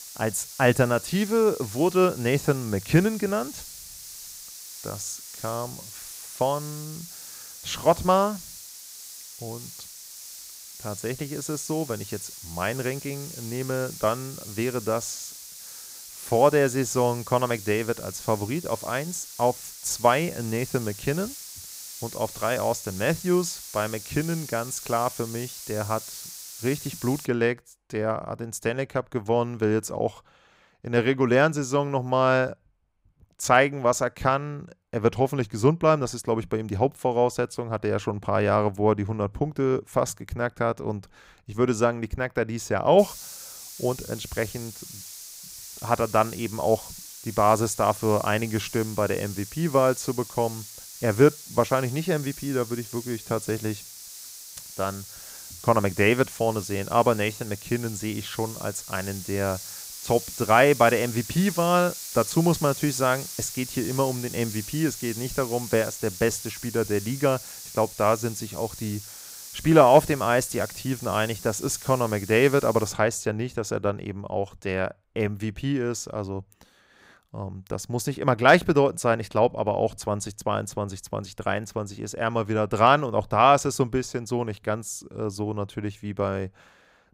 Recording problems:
hiss; noticeable; until 27 s and from 43 s to 1:13; 15 dB below the speech

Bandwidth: 15.5 kHz